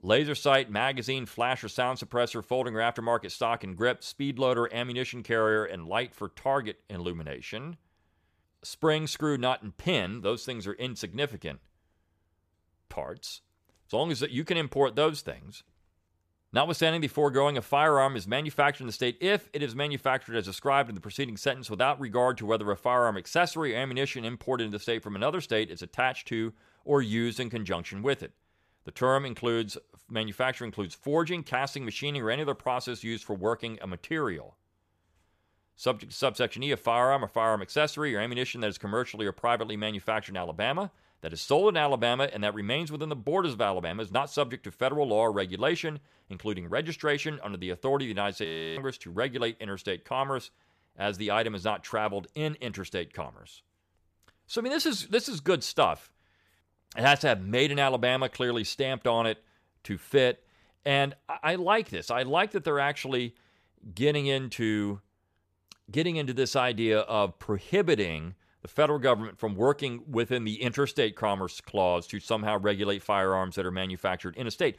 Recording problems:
audio freezing; at 48 s

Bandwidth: 14.5 kHz